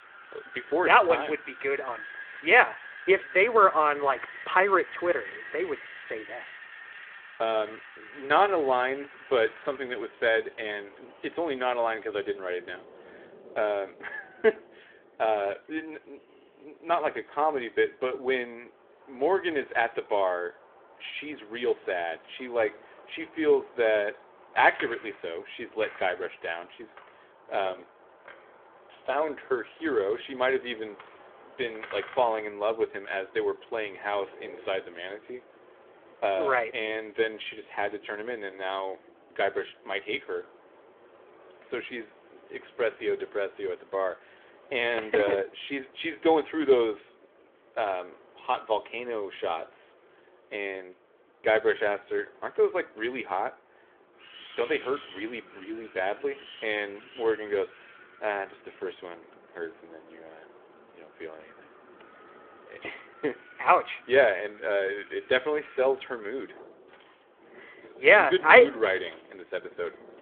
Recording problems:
phone-call audio
wind in the background; faint; throughout; 20 dB below the speech

